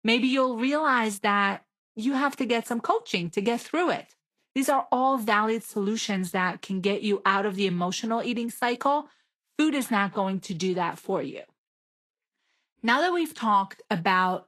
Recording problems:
garbled, watery; slightly; nothing above 12.5 kHz

